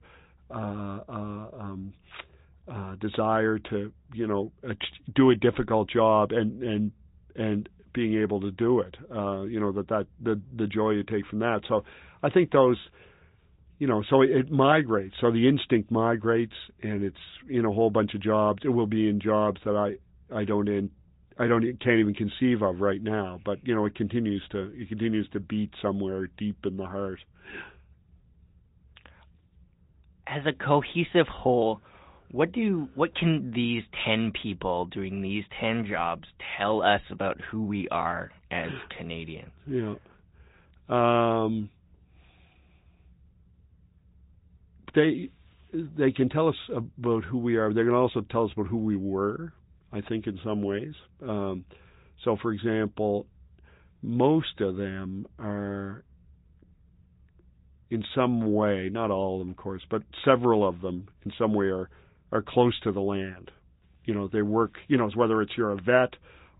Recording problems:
high frequencies cut off; severe; nothing above 4 kHz
garbled, watery; slightly

